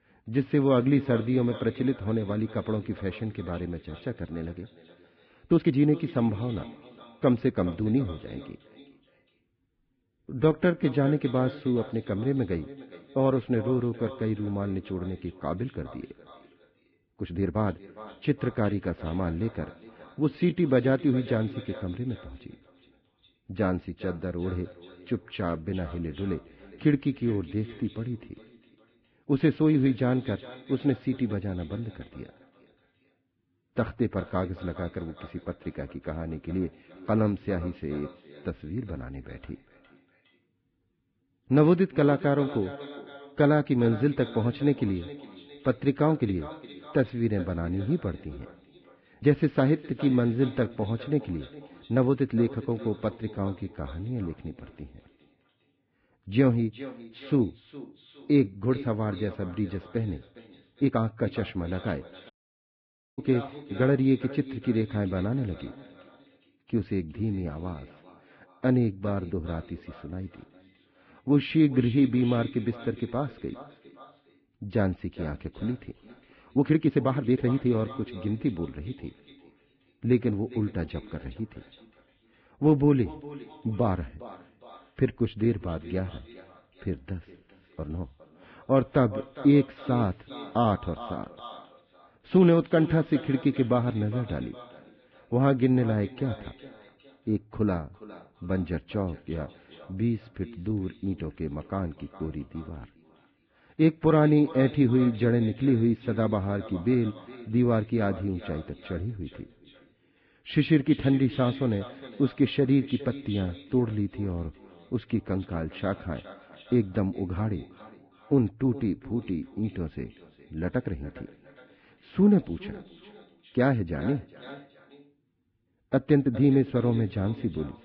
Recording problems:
garbled, watery; badly; nothing above 11.5 kHz
muffled; very; fading above 3 kHz
echo of what is said; noticeable; throughout; 410 ms later, 20 dB below the speech
uneven, jittery; strongly; from 5.5 s to 2:06
audio cutting out; at 1:02 for 1 s

